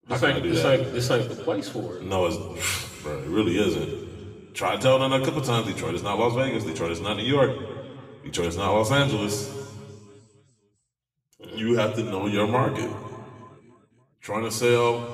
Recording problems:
room echo; slight; dies away in 1.9 s
off-mic speech; somewhat distant

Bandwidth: 15 kHz